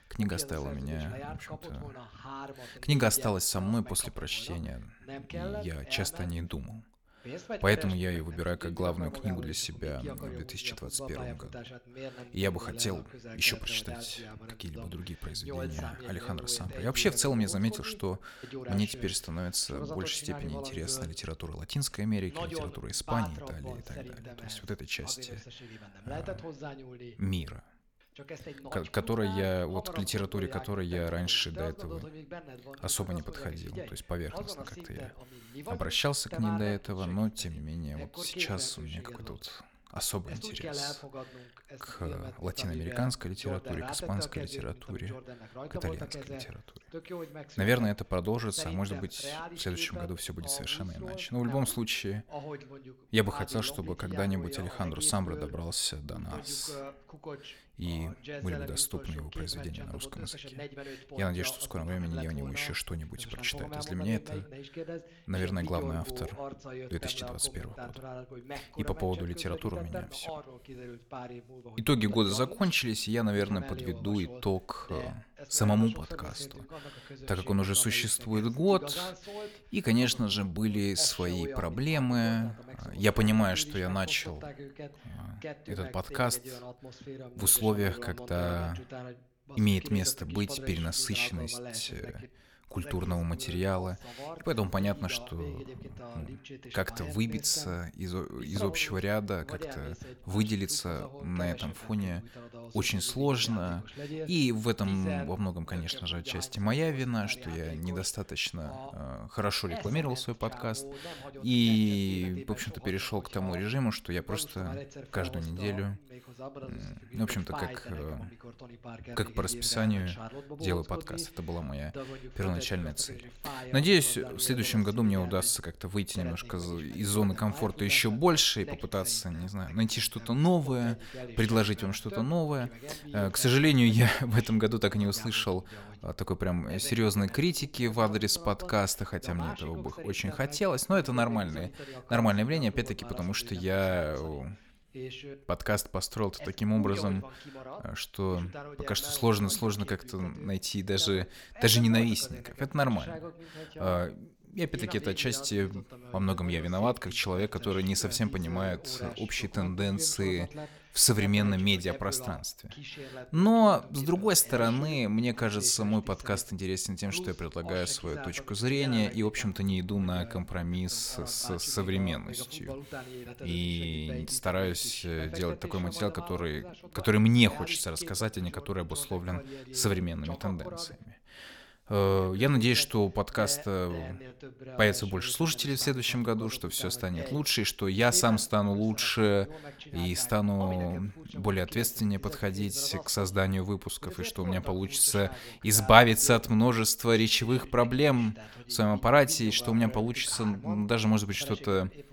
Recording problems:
voice in the background; noticeable; throughout; 15 dB below the speech

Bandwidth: 18.5 kHz